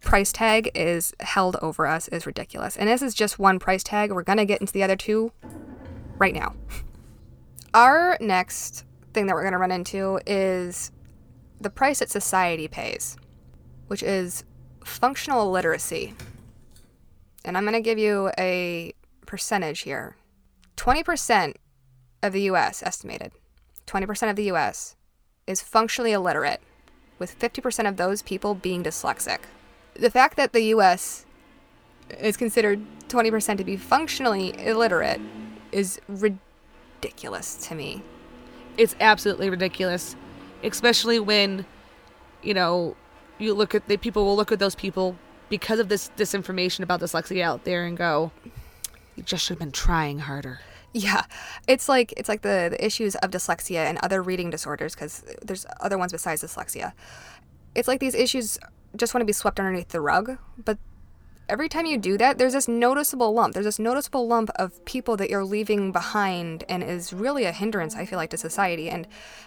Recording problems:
traffic noise; faint; throughout; 25 dB below the speech

